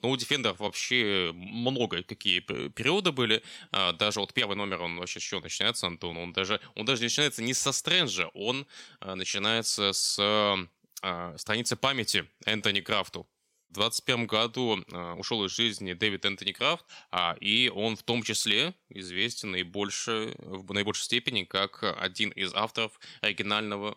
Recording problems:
uneven, jittery; strongly; from 0.5 to 23 s

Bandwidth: 16 kHz